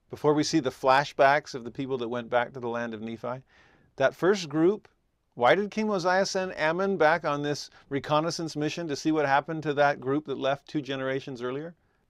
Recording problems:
none

